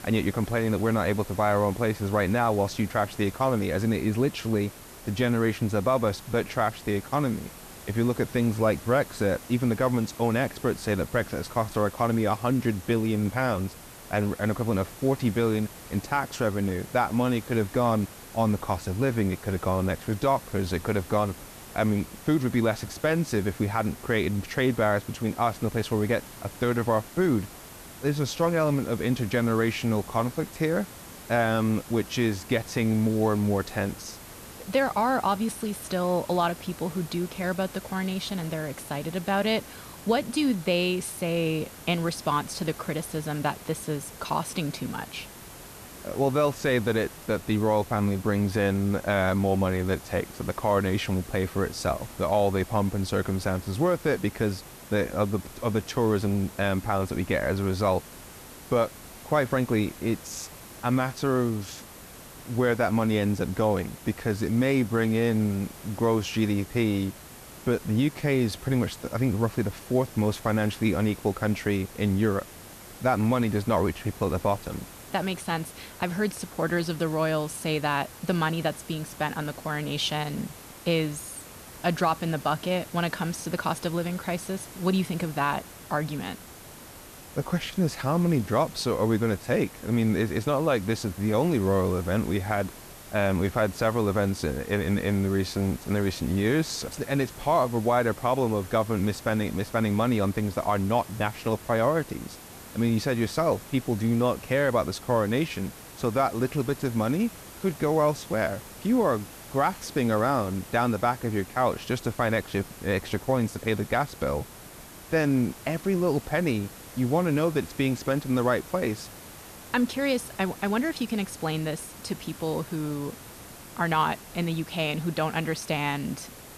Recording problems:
hiss; noticeable; throughout; 15 dB below the speech

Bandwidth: 14 kHz